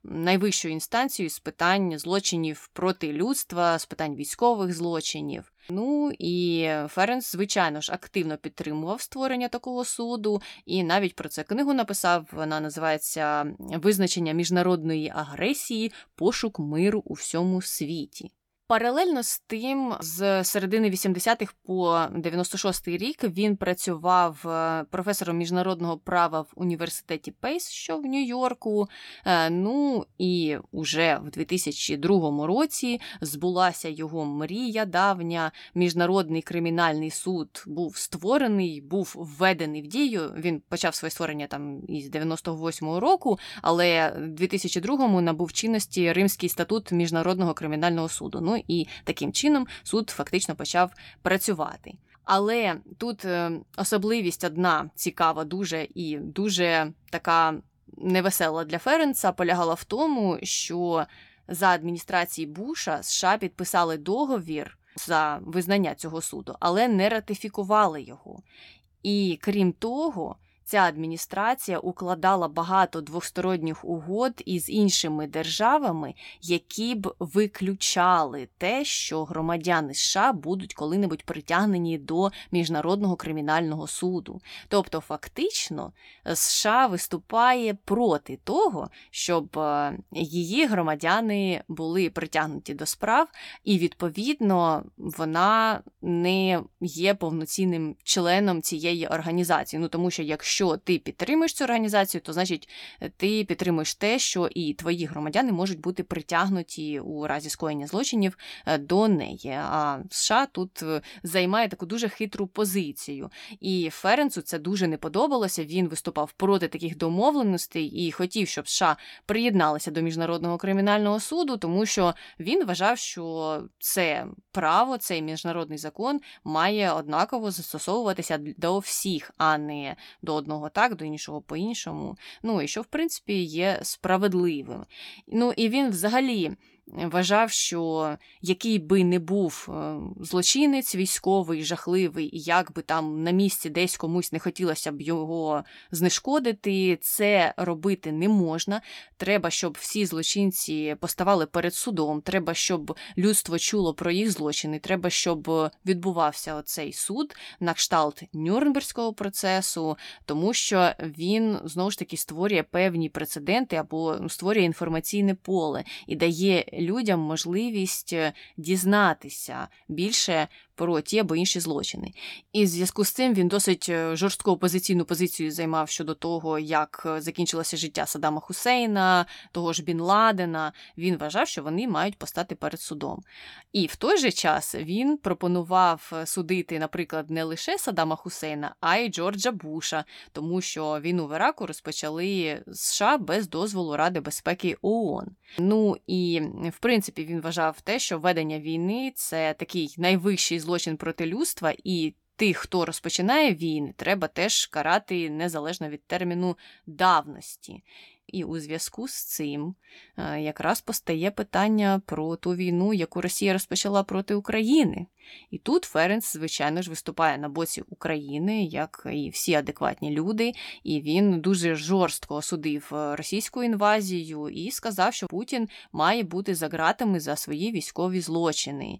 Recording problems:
none

